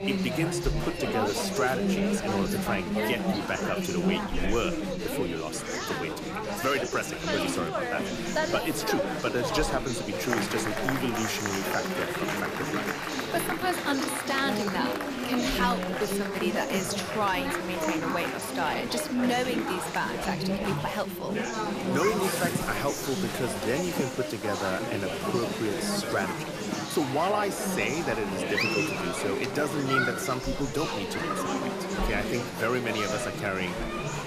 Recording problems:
chatter from many people; very loud; throughout; 1 dB above the speech

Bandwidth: 14.5 kHz